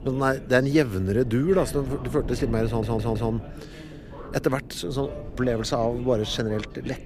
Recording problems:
voice in the background; noticeable; throughout; 20 dB below the speech
wind noise on the microphone; occasional gusts; 20 dB below the speech
audio stuttering; at 2.5 s

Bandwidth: 15 kHz